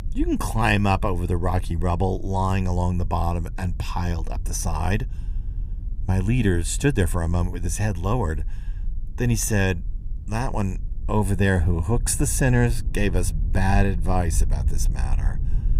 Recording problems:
low rumble; faint; throughout; 20 dB below the speech

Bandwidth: 15.5 kHz